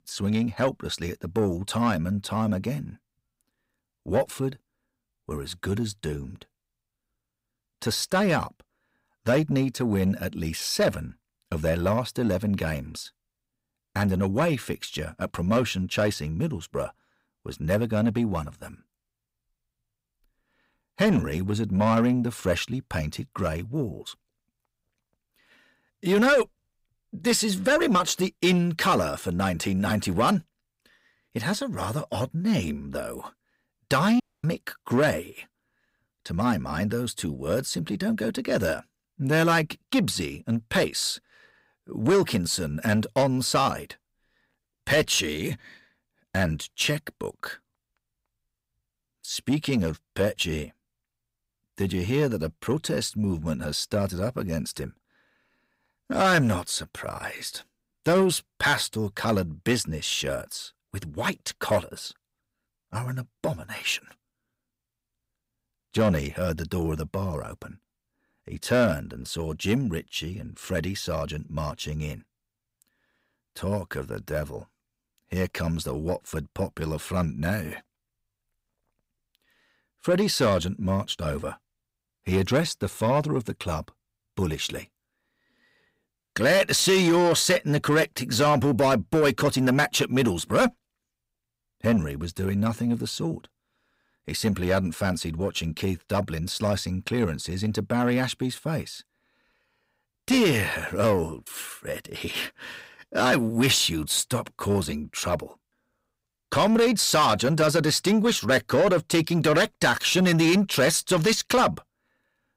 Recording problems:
distortion; slight; 10 dB below the speech
audio cutting out; at 34 s

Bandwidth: 15.5 kHz